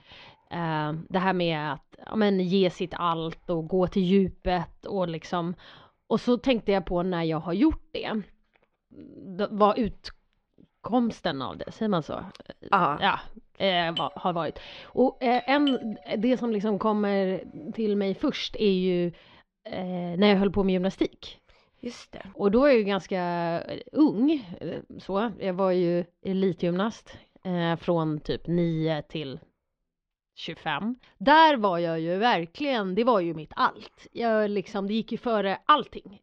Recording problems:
muffled; very slightly; fading above 4 kHz
doorbell; noticeable; from 14 to 16 s; peak 9 dB below the speech

